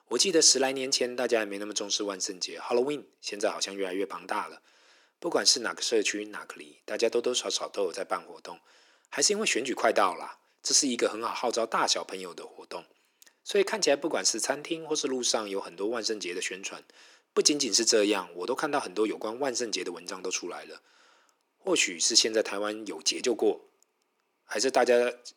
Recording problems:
thin; very; fading below 350 Hz

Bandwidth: 18 kHz